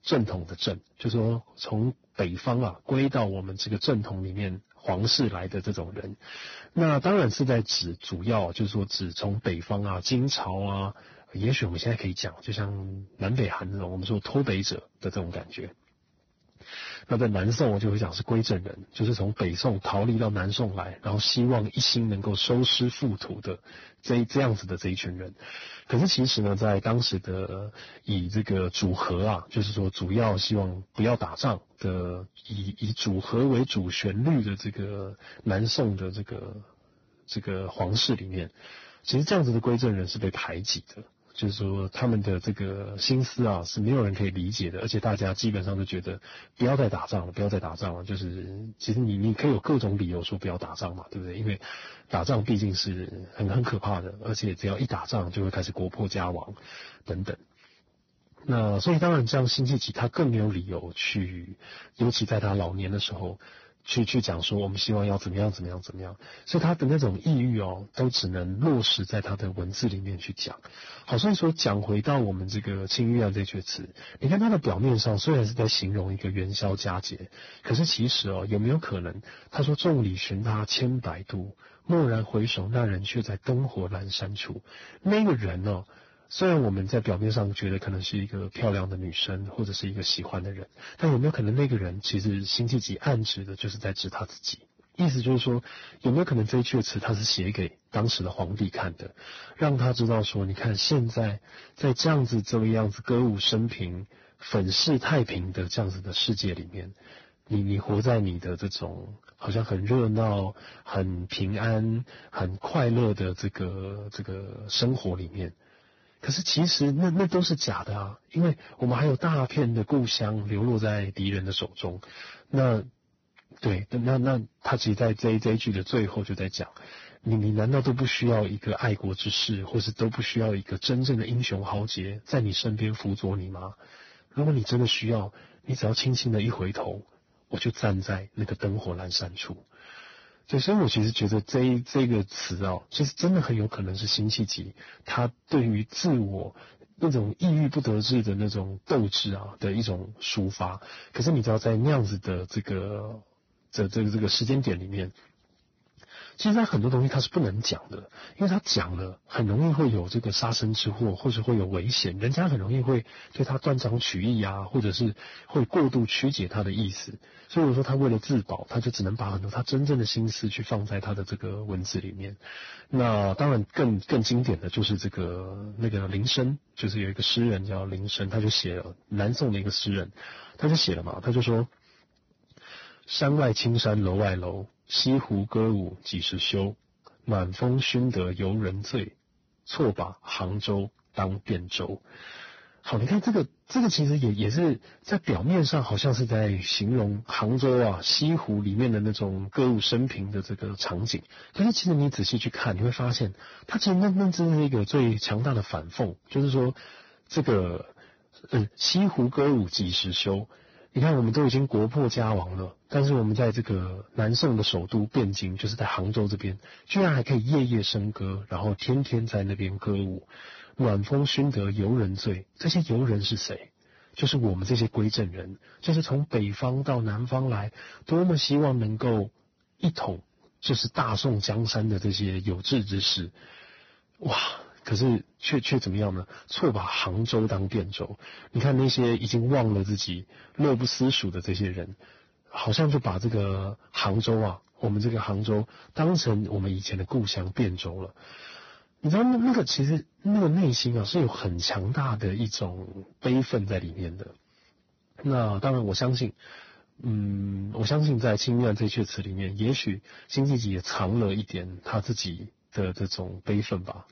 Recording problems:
garbled, watery; badly; nothing above 6 kHz
distortion; slight; 9% of the sound clipped

